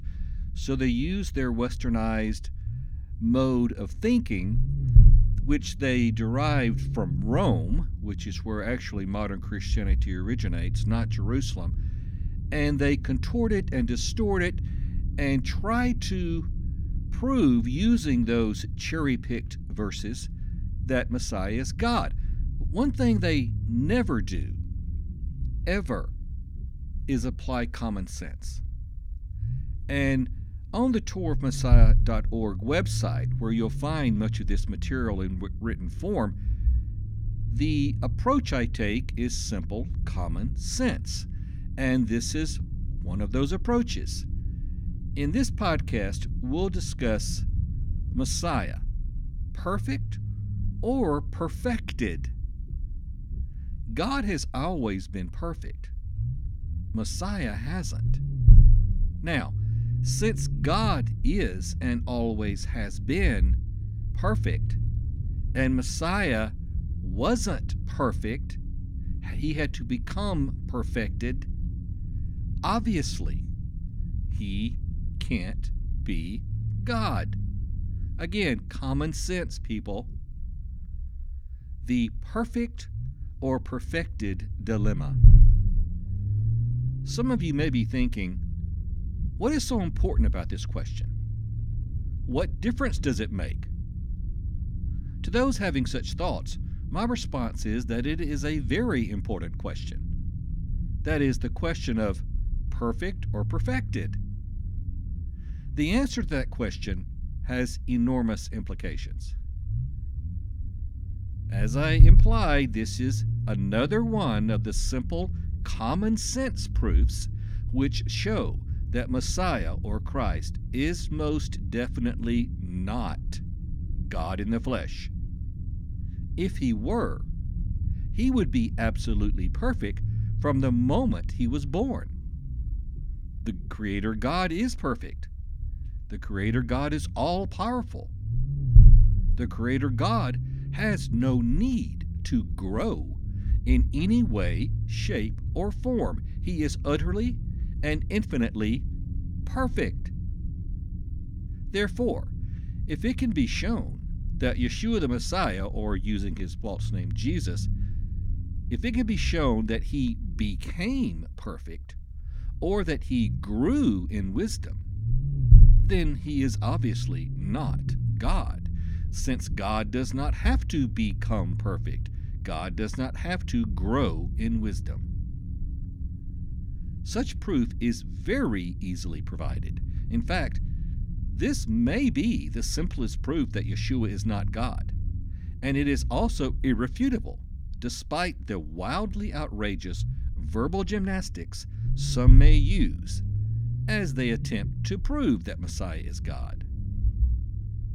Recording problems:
low rumble; noticeable; throughout; 15 dB below the speech

